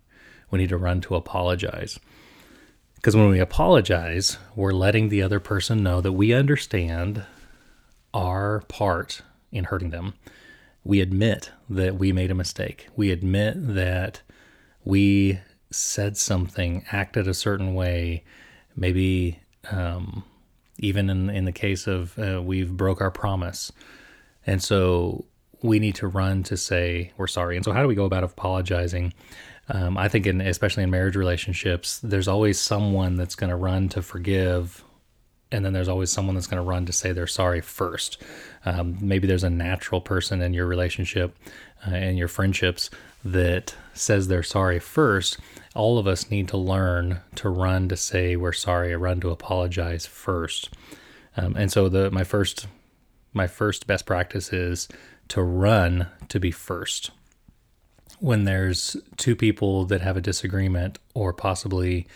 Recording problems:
uneven, jittery; strongly; from 6.5 to 59 s

